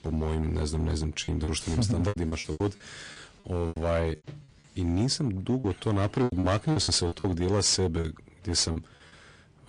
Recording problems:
distortion; slight; 7% of the sound clipped
garbled, watery; slightly; nothing above 9 kHz
choppy; very; 11% of the speech affected

